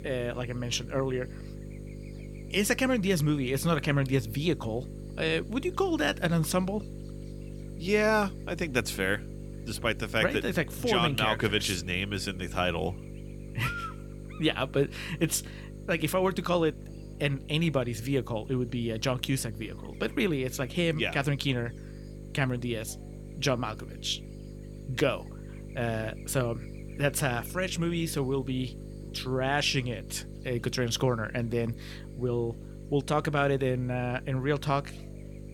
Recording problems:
electrical hum; noticeable; throughout; 50 Hz, 20 dB below the speech

